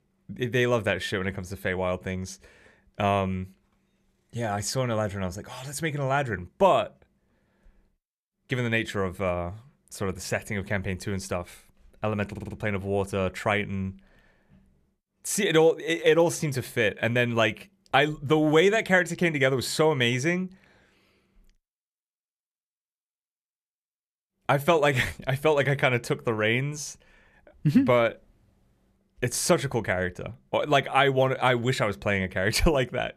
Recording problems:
audio stuttering; at 12 s

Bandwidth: 14.5 kHz